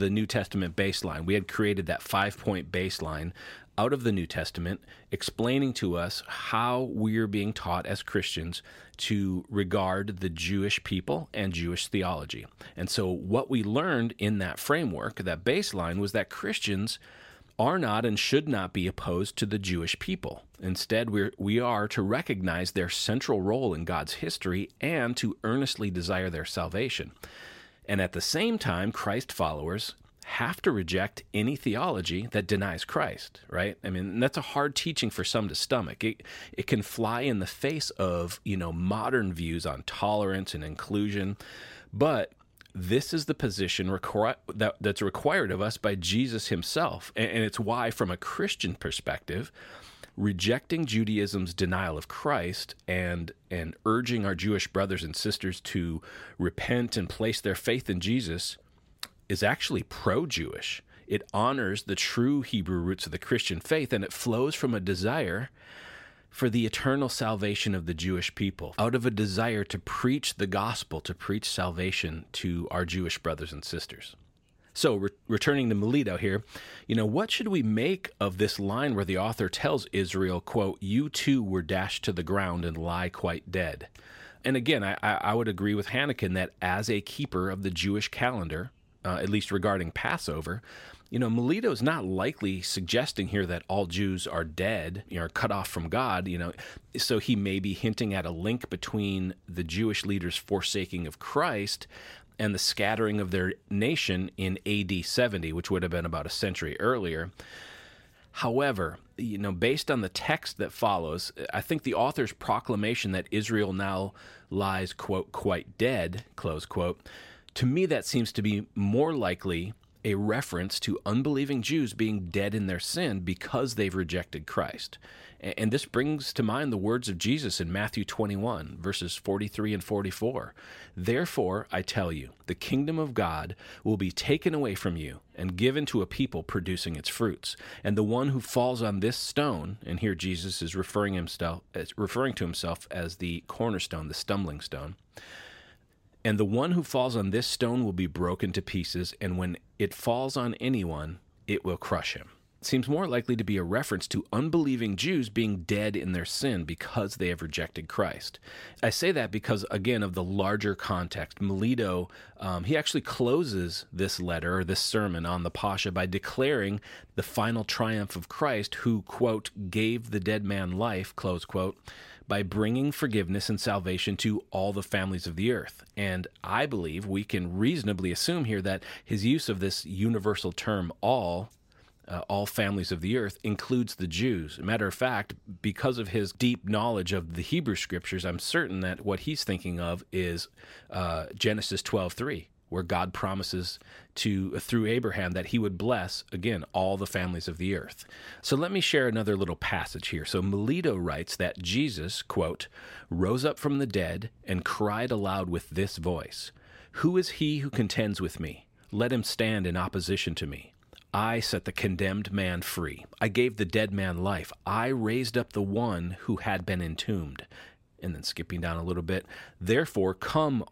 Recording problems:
abrupt cut into speech; at the start

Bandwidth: 16 kHz